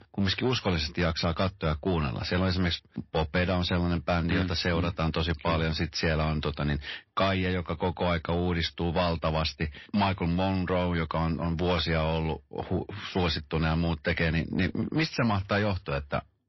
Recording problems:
distortion; slight; 10 dB below the speech
garbled, watery; slightly; nothing above 5.5 kHz

